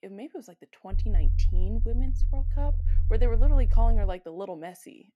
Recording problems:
low rumble; noticeable; from 1 to 4 s; 10 dB below the speech

